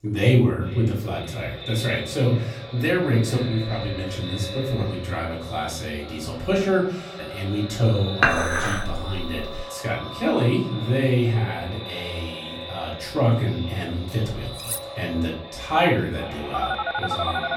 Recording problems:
echo of what is said; strong; throughout; 450 ms later, 10 dB below the speech
off-mic speech; far
room echo; slight; dies away in 0.5 s
clattering dishes; loud; from 8 to 9.5 s; peak 5 dB above the speech
clattering dishes; noticeable; at 15 s; peak 5 dB below the speech
phone ringing; noticeable; from 17 s on; peak 2 dB below the speech

